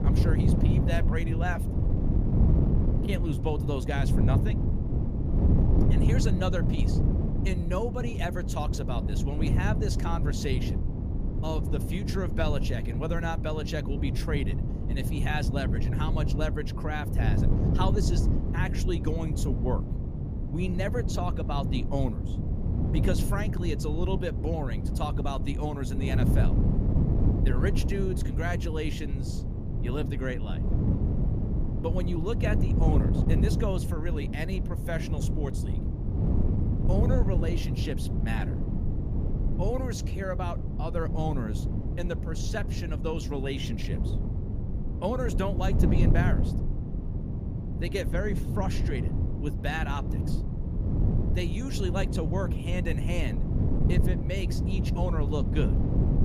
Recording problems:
wind noise on the microphone; heavy; 4 dB below the speech

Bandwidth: 15 kHz